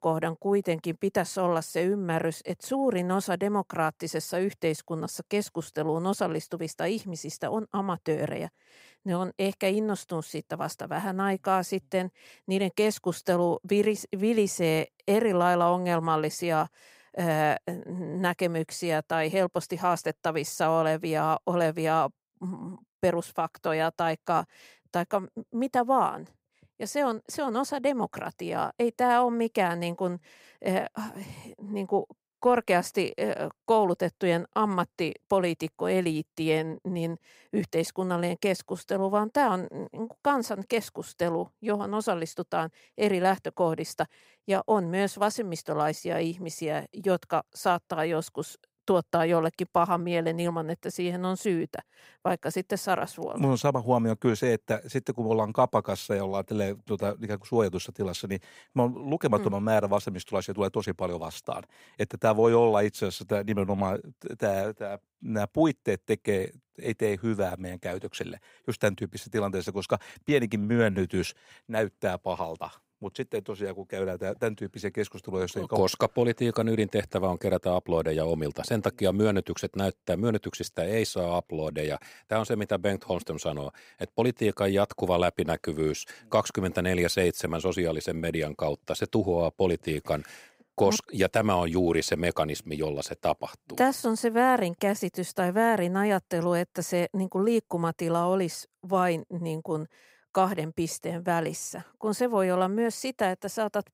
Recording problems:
none

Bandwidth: 15.5 kHz